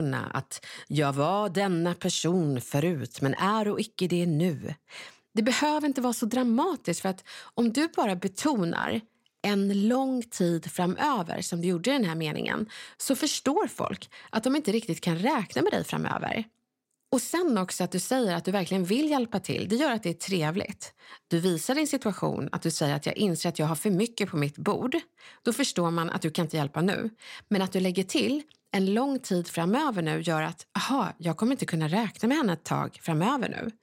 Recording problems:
abrupt cut into speech; at the start

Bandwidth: 16 kHz